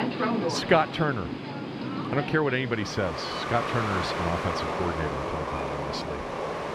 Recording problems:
train or aircraft noise; loud; throughout; 2 dB below the speech

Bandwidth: 14 kHz